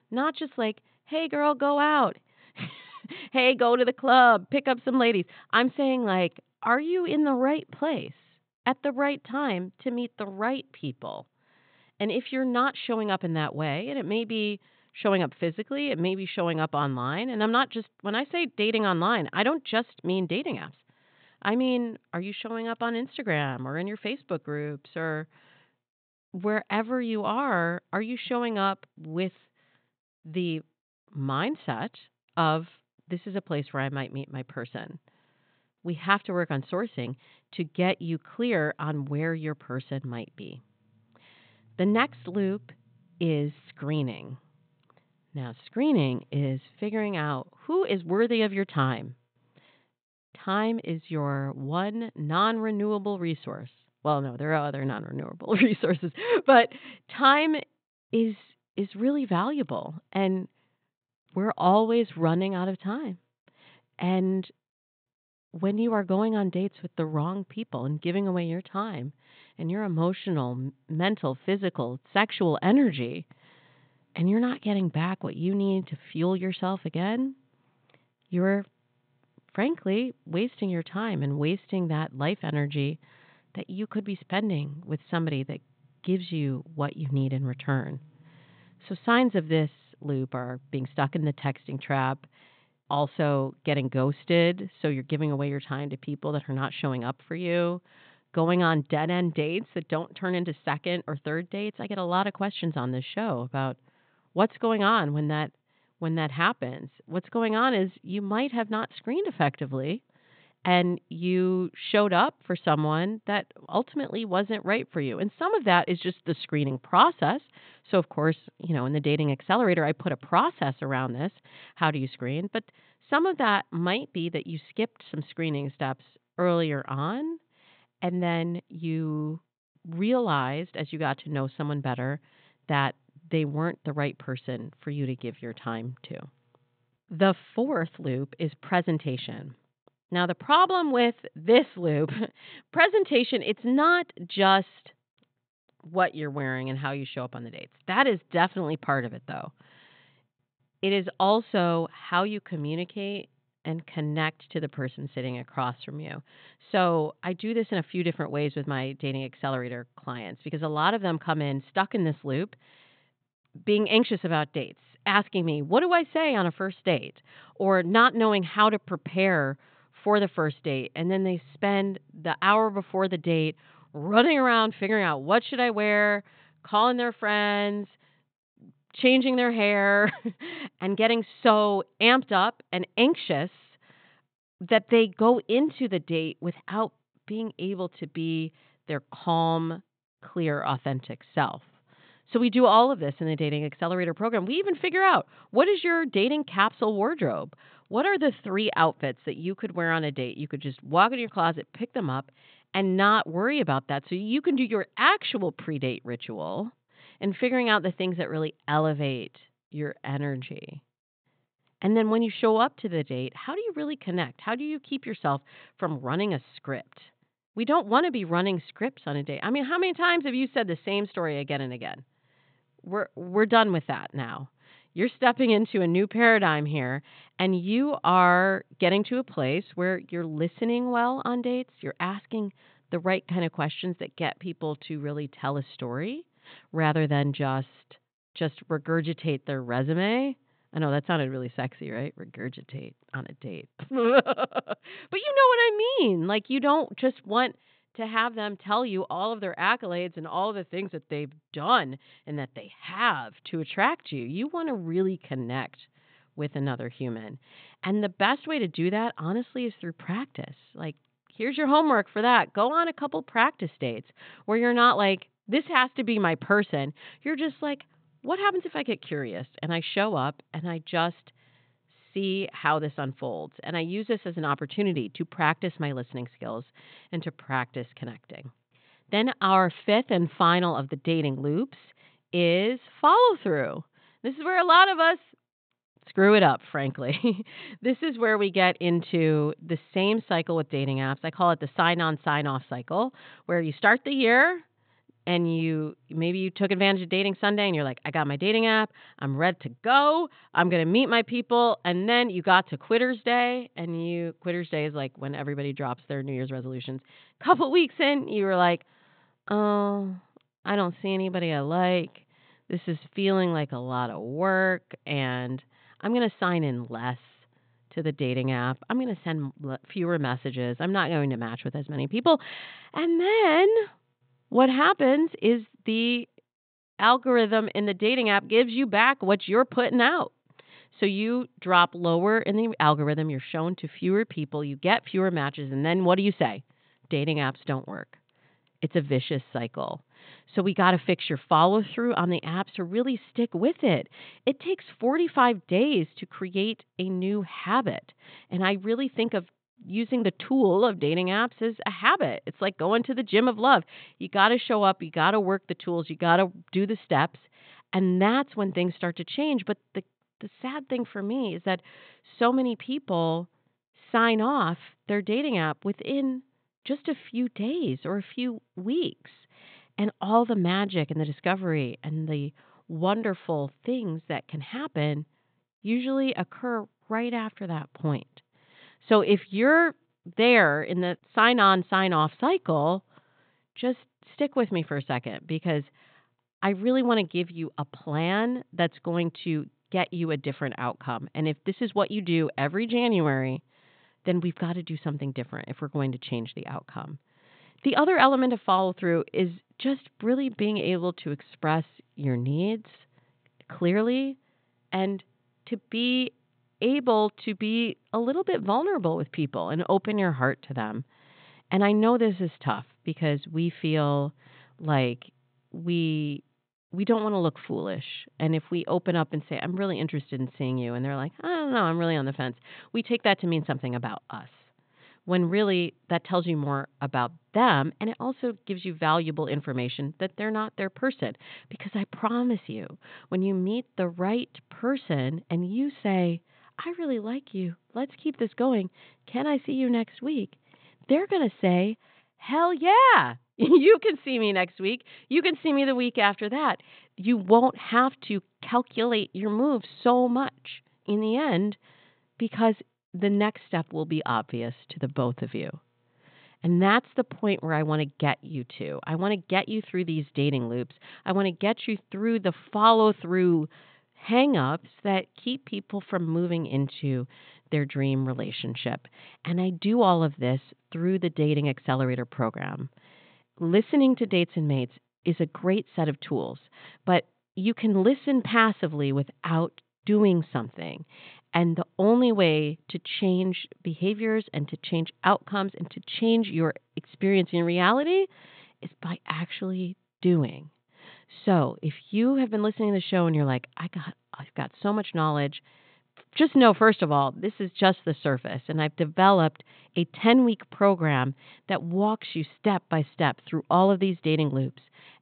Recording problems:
high frequencies cut off; severe; nothing above 4 kHz

